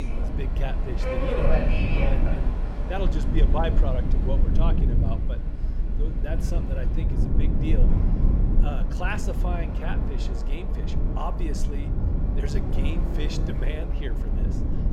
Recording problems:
train or aircraft noise; loud; throughout; 2 dB below the speech
low rumble; loud; throughout; 4 dB below the speech
abrupt cut into speech; at the start

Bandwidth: 16.5 kHz